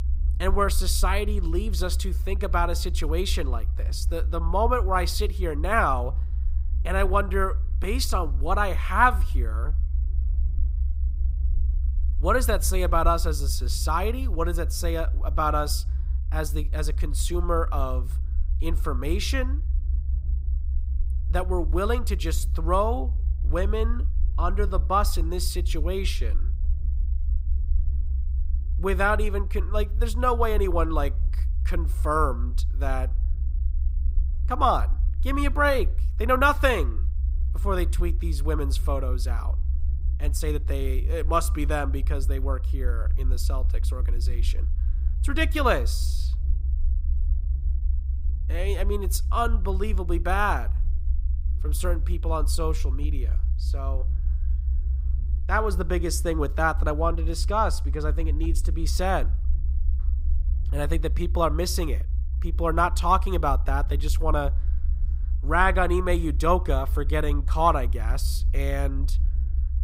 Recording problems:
low rumble; faint; throughout; 20 dB below the speech

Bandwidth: 15.5 kHz